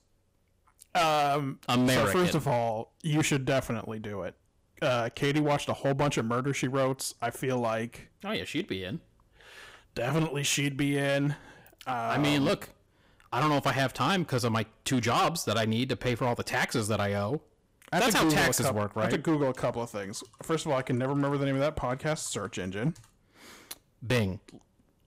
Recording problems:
distortion; heavy; 9% of the sound clipped

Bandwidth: 15.5 kHz